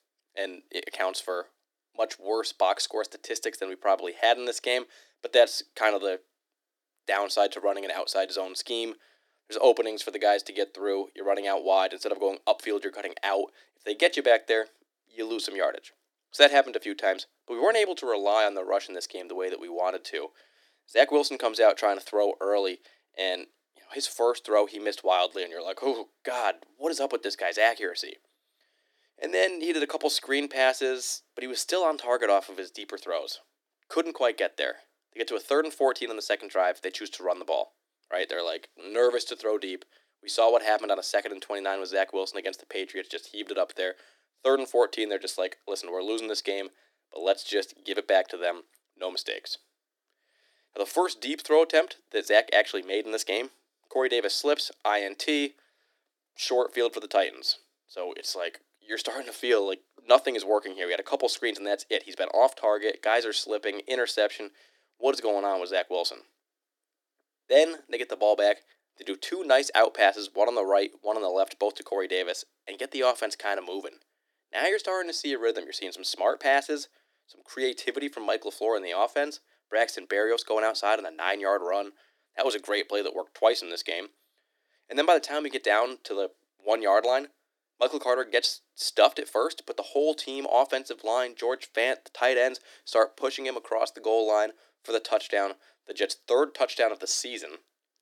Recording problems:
thin; somewhat; fading below 300 Hz

